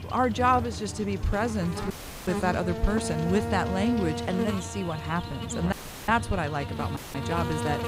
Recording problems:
electrical hum; loud; throughout; 50 Hz, 7 dB below the speech
audio cutting out; filled with static; at 2 s, at 5.5 s and at 7 s

